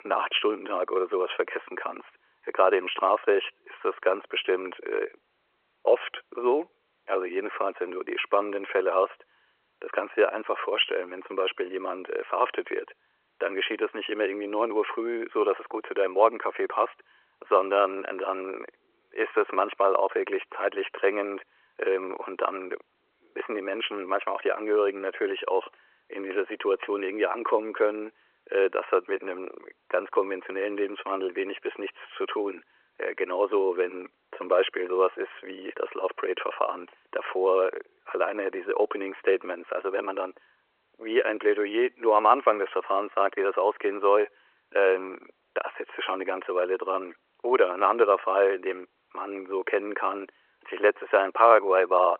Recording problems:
phone-call audio

